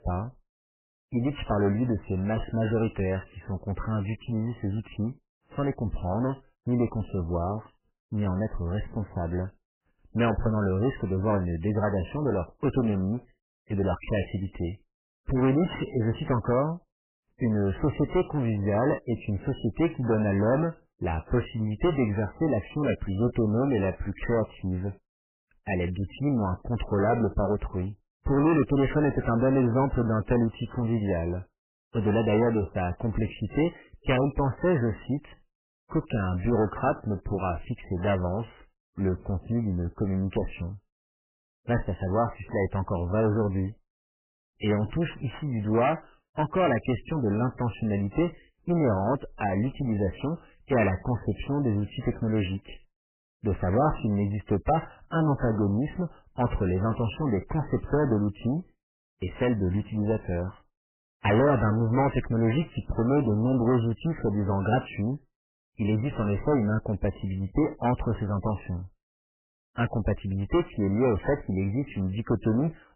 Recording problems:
distortion; heavy; 11% of the sound clipped
garbled, watery; badly; nothing above 3 kHz

